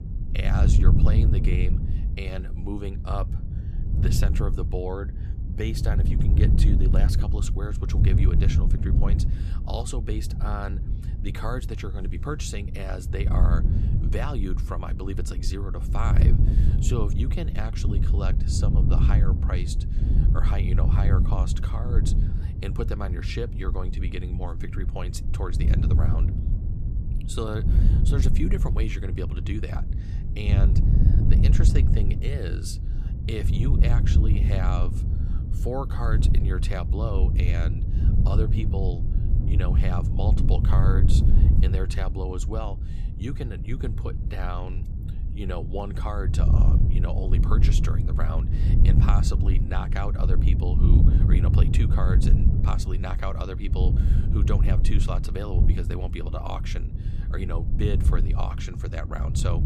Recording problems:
wind noise on the microphone; heavy; 3 dB below the speech

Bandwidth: 15 kHz